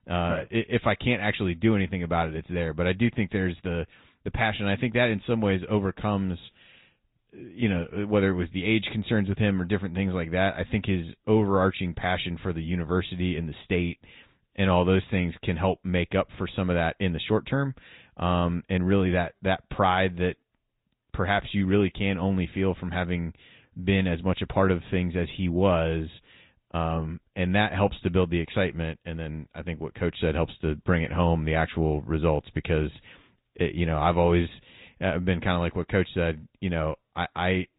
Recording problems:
high frequencies cut off; severe; nothing above 4 kHz
garbled, watery; slightly

